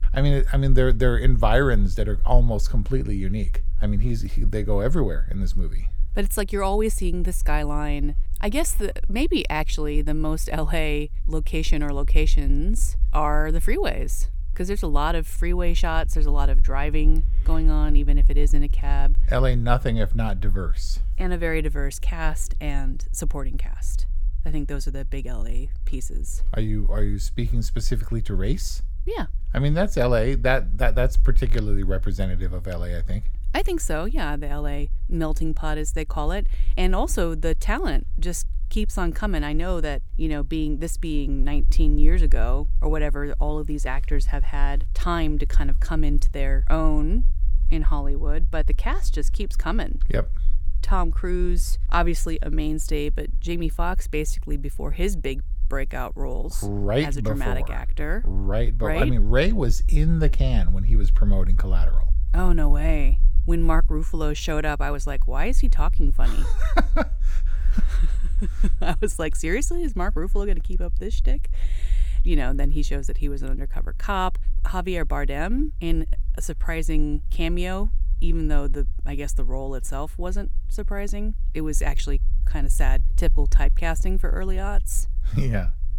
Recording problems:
low rumble; faint; throughout; 25 dB below the speech

